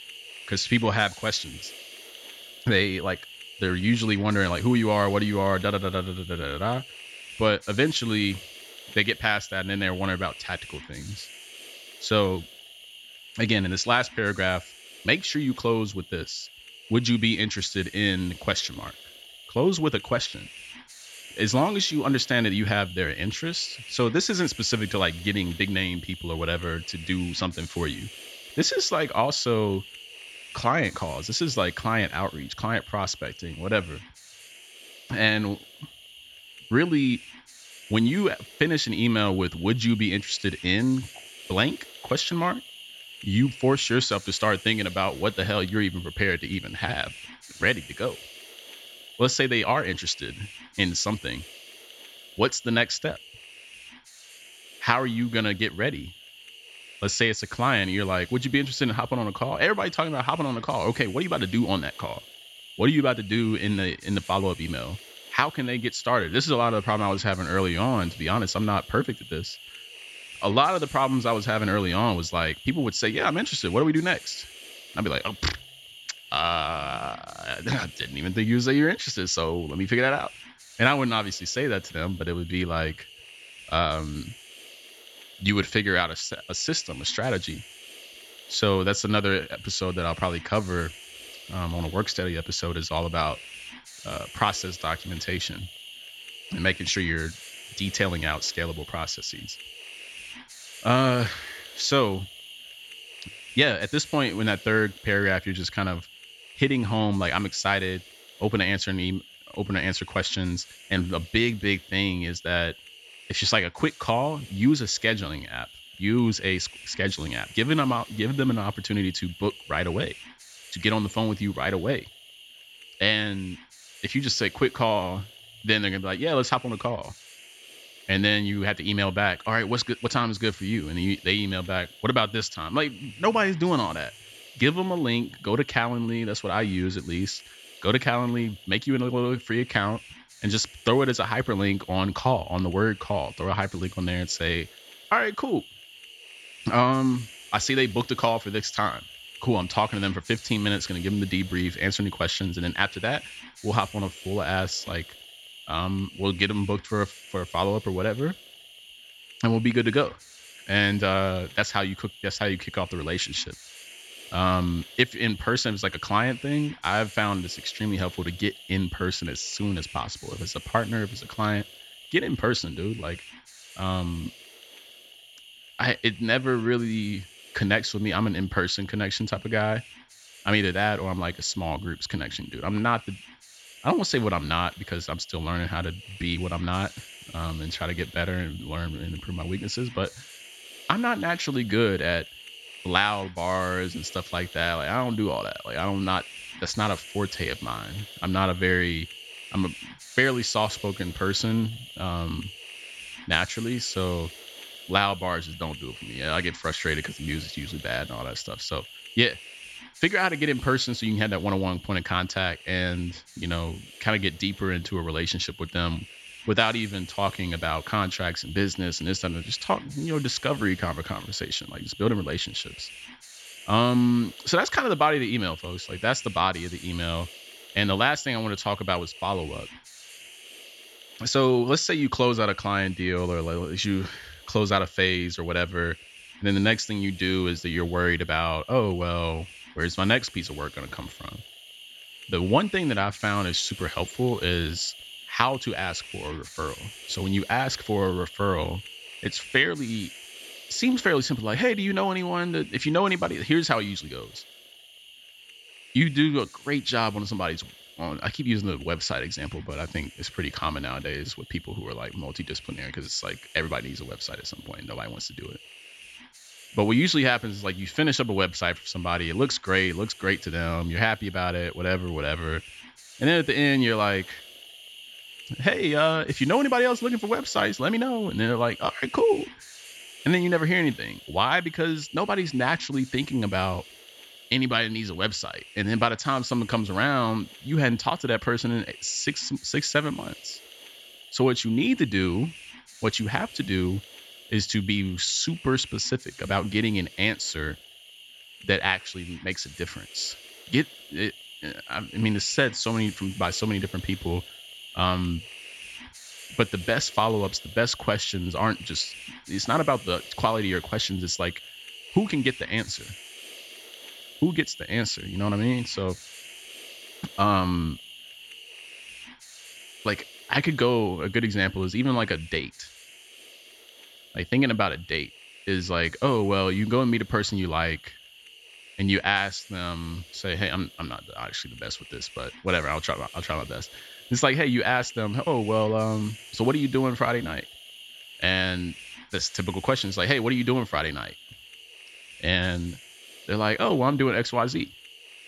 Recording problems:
high frequencies cut off; noticeable; nothing above 7.5 kHz
hiss; noticeable; throughout; 15 dB below the speech

